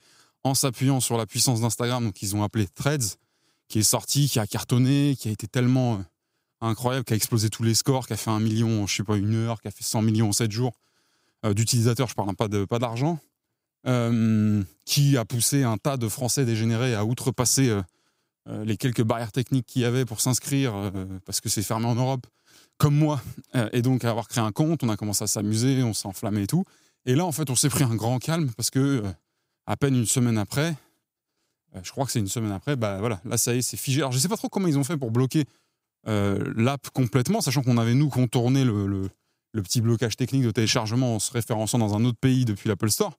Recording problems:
none

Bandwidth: 15.5 kHz